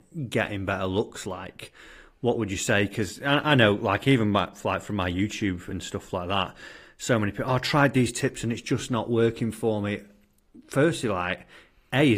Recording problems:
garbled, watery; slightly; nothing above 15 kHz
abrupt cut into speech; at the end

